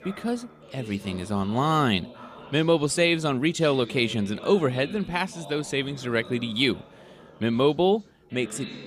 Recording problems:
background chatter; noticeable; throughout; 4 voices, 20 dB below the speech

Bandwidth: 15 kHz